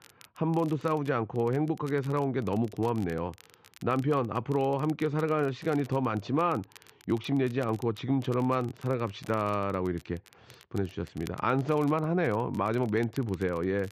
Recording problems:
muffled; slightly; fading above 3.5 kHz
crackle, like an old record; faint; 25 dB below the speech

